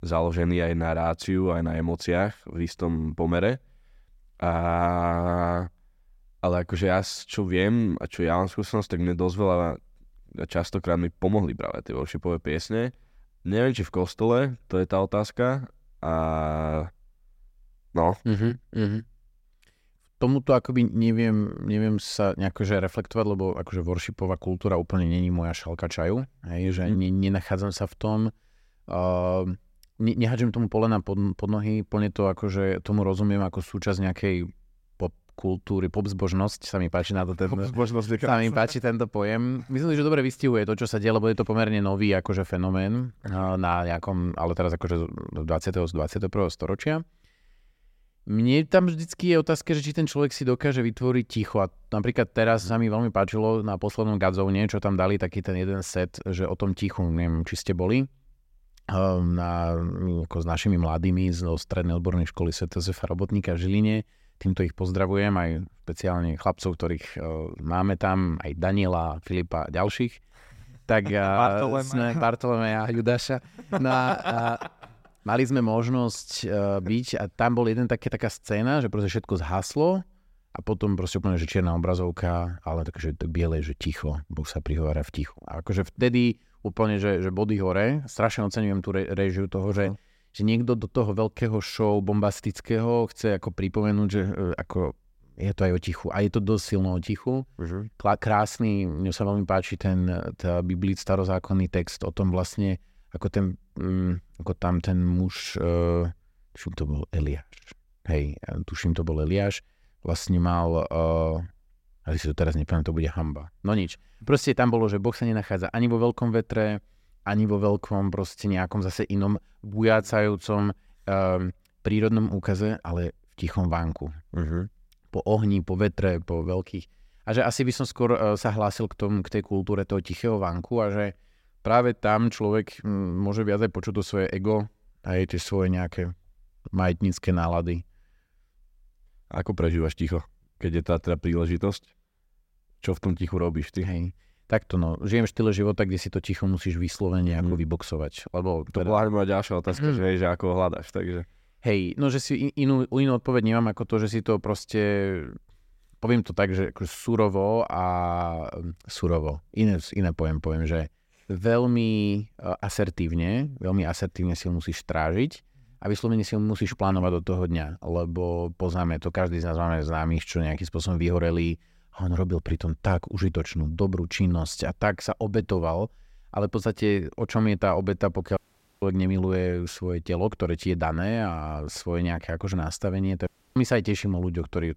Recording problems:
audio cutting out; at 2:58 and at 3:03

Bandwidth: 16 kHz